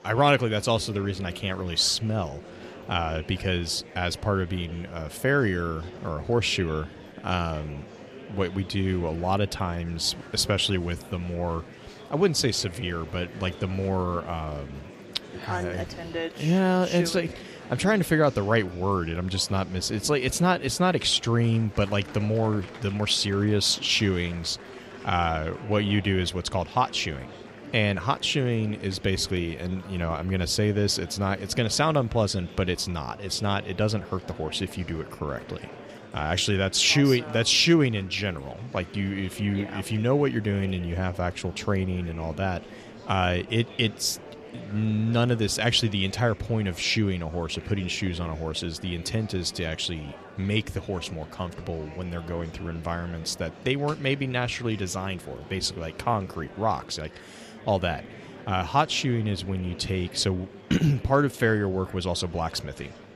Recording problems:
murmuring crowd; noticeable; throughout; 15 dB below the speech

